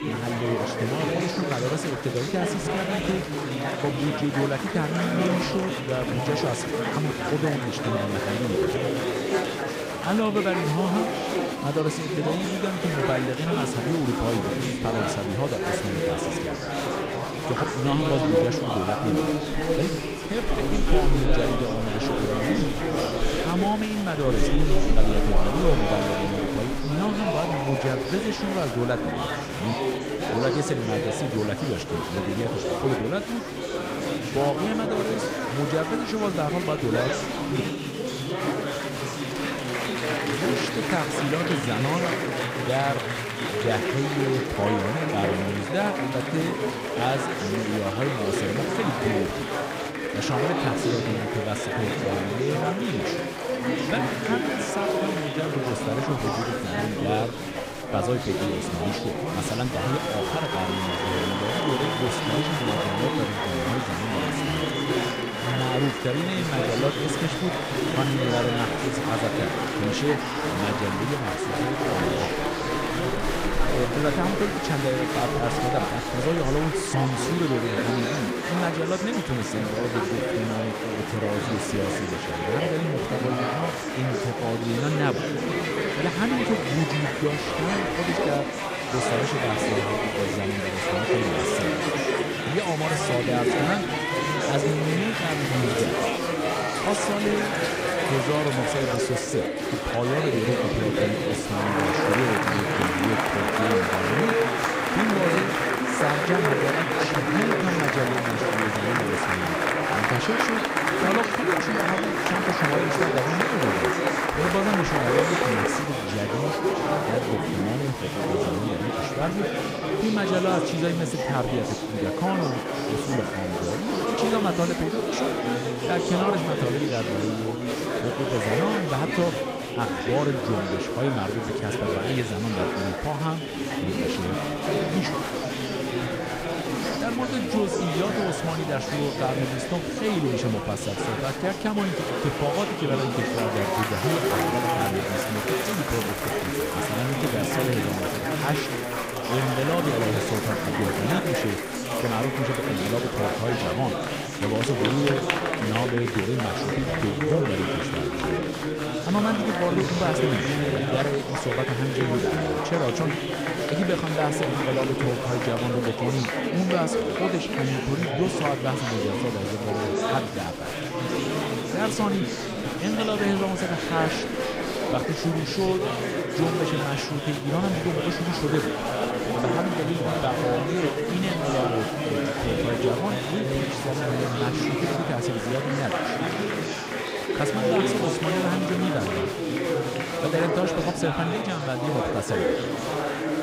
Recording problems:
chatter from many people; very loud; throughout; 2 dB above the speech

